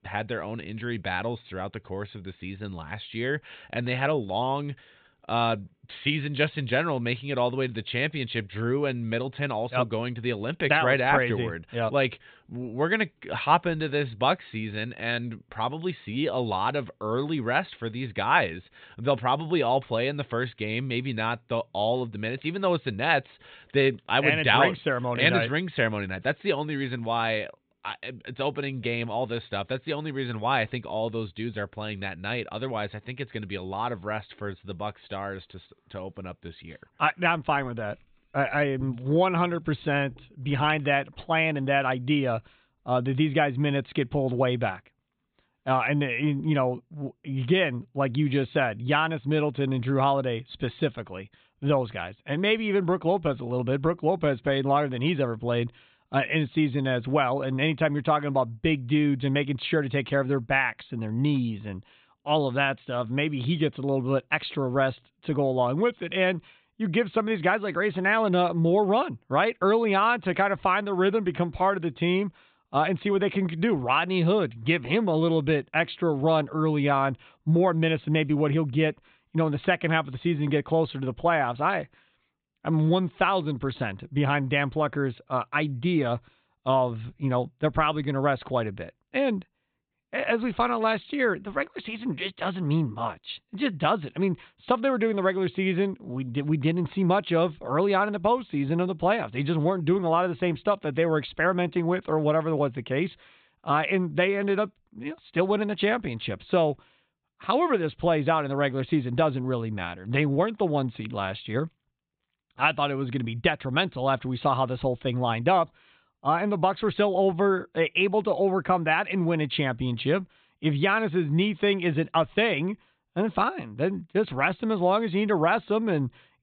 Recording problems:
high frequencies cut off; severe; nothing above 4 kHz

